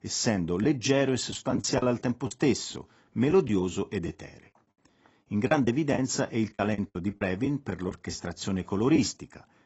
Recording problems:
garbled, watery; badly; nothing above 8 kHz
choppy; very; 7% of the speech affected

